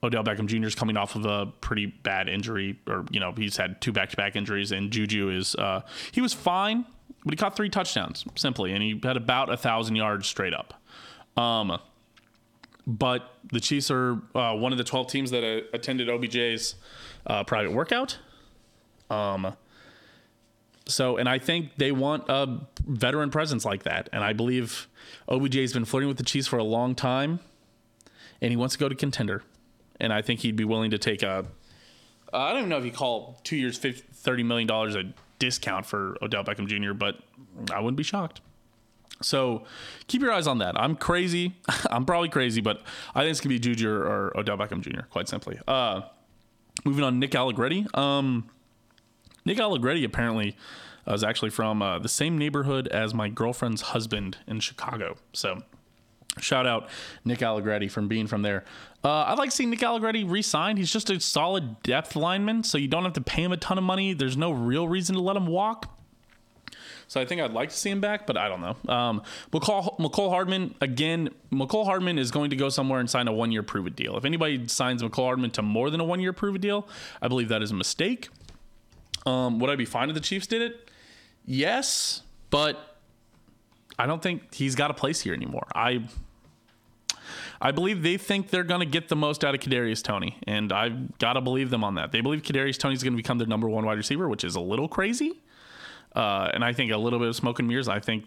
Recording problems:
squashed, flat; heavily

